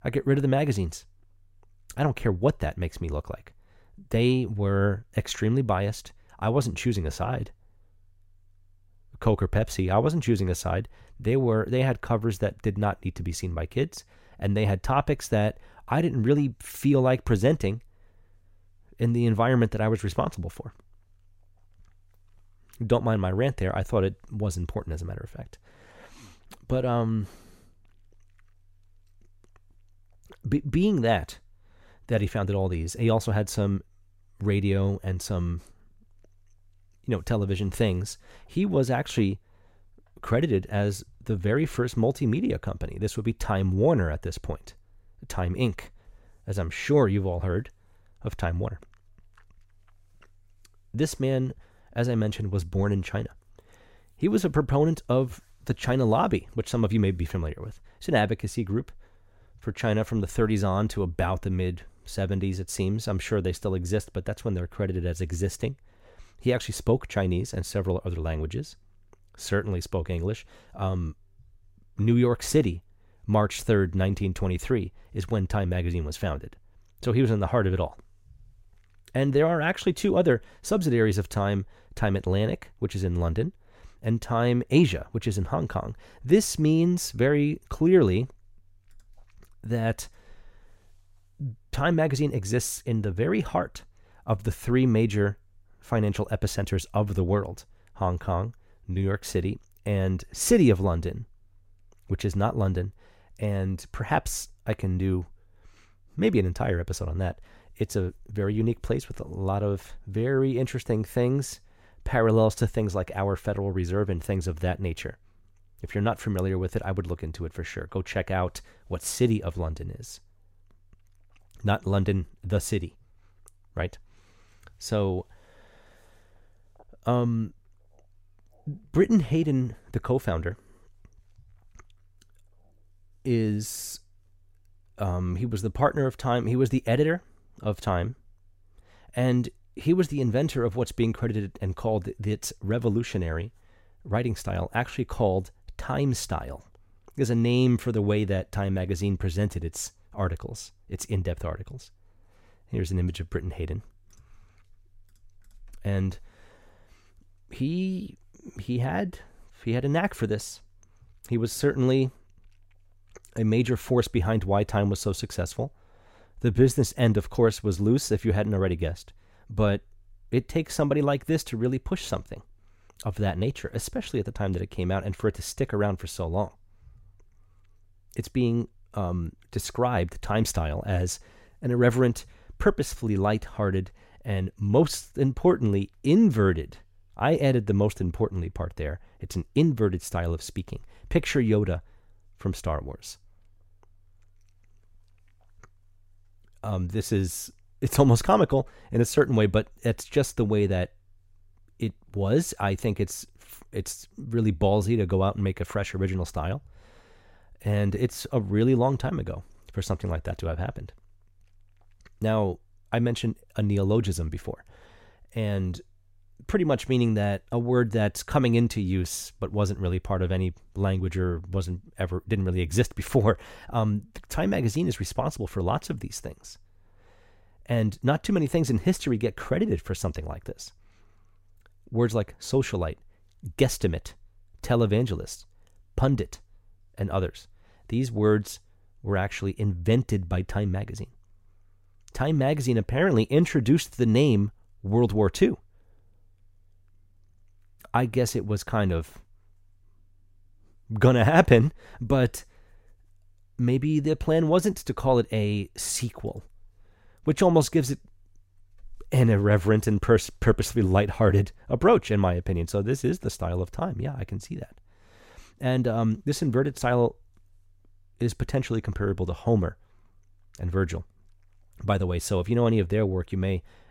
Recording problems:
none

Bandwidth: 16 kHz